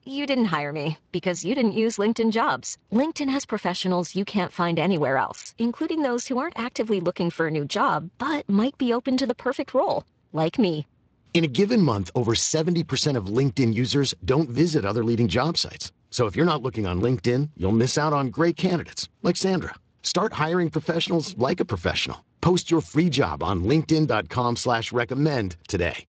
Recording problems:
garbled, watery; slightly; nothing above 7.5 kHz

